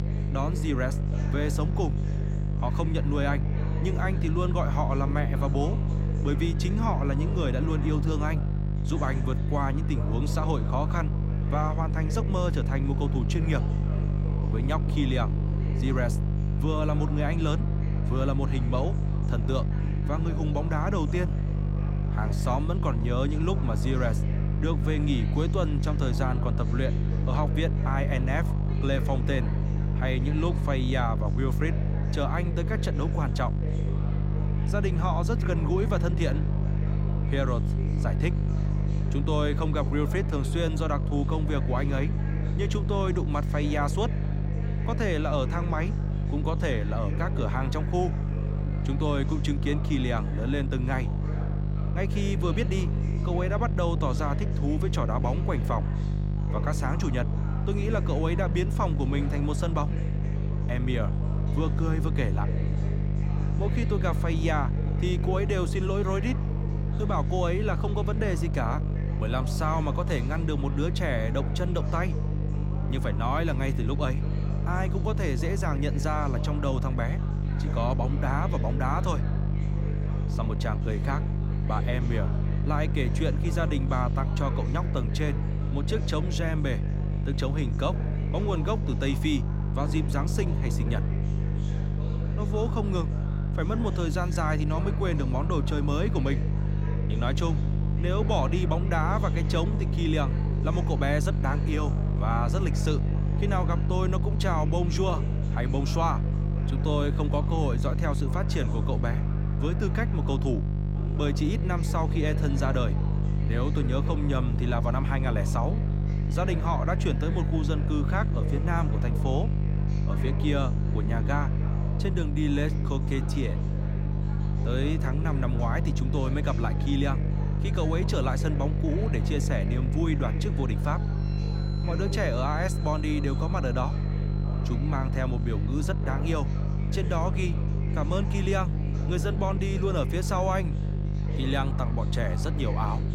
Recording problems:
electrical hum; loud; throughout; 50 Hz, 7 dB below the speech
background chatter; noticeable; throughout; 3 voices, 15 dB below the speech
background music; faint; throughout; 30 dB below the speech

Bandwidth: 16 kHz